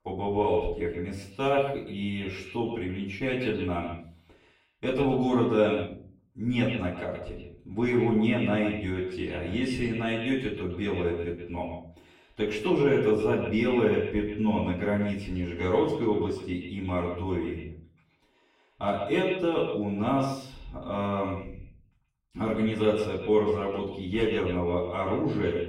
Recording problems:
echo of what is said; strong; throughout; 130 ms later, 8 dB below the speech
off-mic speech; far
room echo; slight; dies away in 0.4 s

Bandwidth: 16 kHz